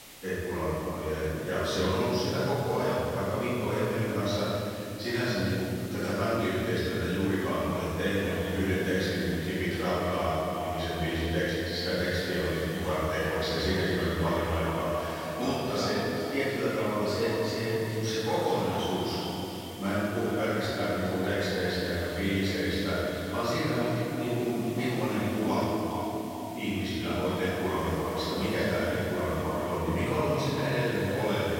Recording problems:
echo of what is said; strong; from 8 s on; 410 ms later, 10 dB below the speech
room echo; strong; dies away in 3 s
off-mic speech; far
hiss; very faint; throughout; 15 dB below the speech
abrupt cut into speech; at the end

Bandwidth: 16 kHz